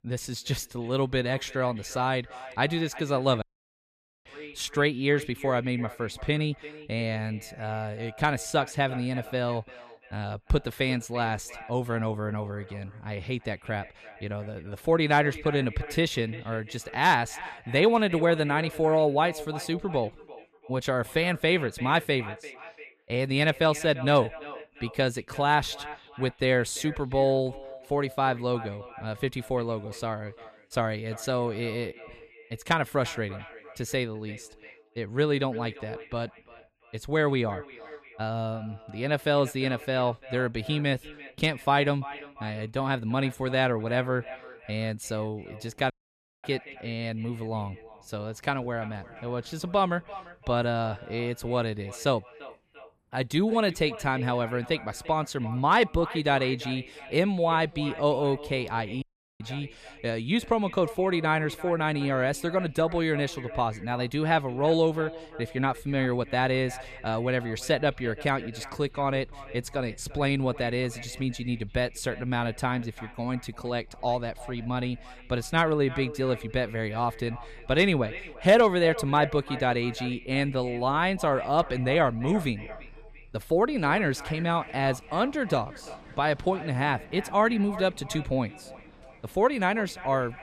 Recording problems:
echo of what is said; noticeable; throughout; 340 ms later, 15 dB below the speech
traffic noise; faint; throughout; 30 dB below the speech
audio cutting out; at 3.5 s for 1 s, at 46 s for 0.5 s and at 59 s

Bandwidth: 14.5 kHz